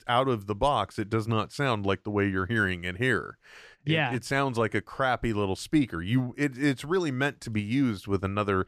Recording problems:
none

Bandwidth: 14 kHz